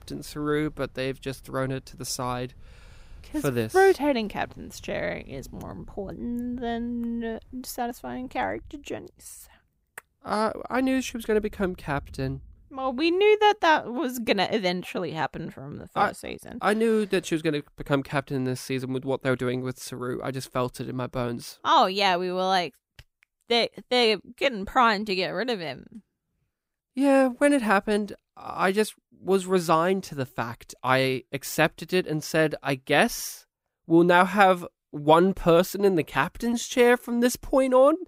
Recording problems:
rain or running water; faint; until 14 s; 25 dB below the speech

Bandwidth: 15.5 kHz